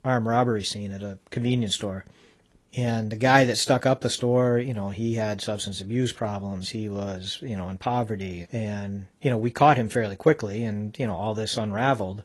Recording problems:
garbled, watery; slightly

